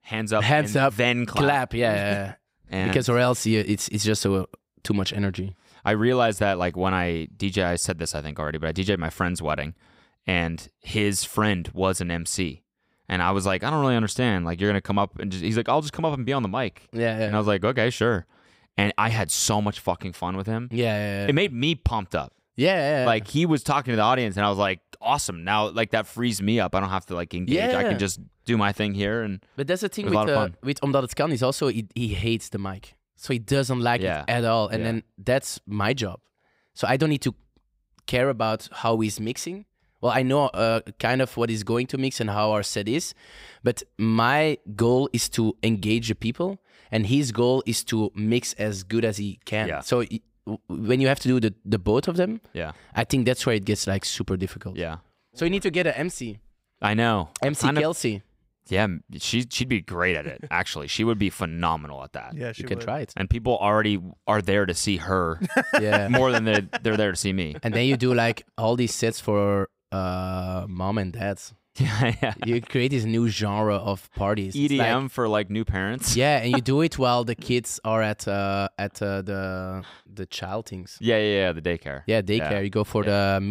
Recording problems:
abrupt cut into speech; at the end

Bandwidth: 15.5 kHz